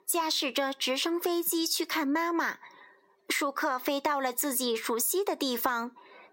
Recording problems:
squashed, flat; heavily

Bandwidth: 16 kHz